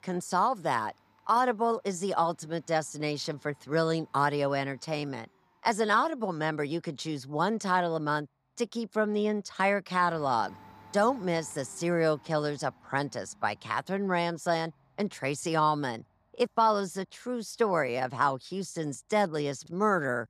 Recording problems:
household noises; faint; throughout; 30 dB below the speech

